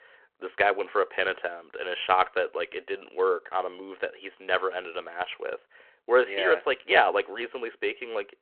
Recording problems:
phone-call audio

